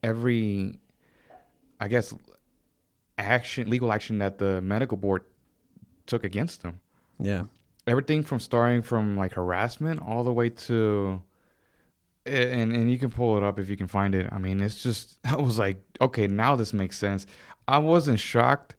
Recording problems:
garbled, watery; slightly
uneven, jittery; strongly; from 1.5 to 18 s

